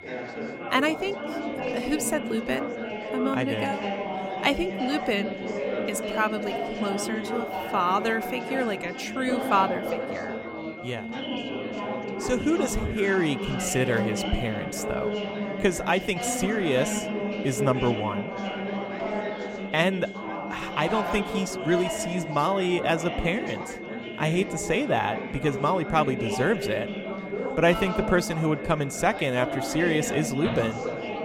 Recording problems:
chatter from many people; loud; throughout; 5 dB below the speech
high-pitched whine; noticeable; throughout; 2 kHz, 15 dB below the speech

